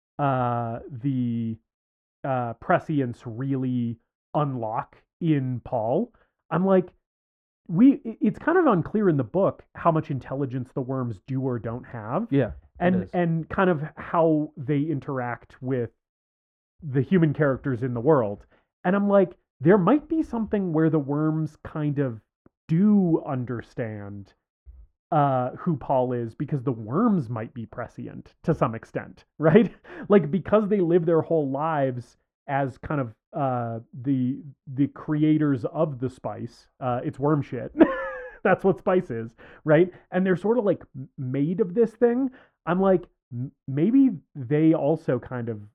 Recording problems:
muffled; very; fading above 2.5 kHz

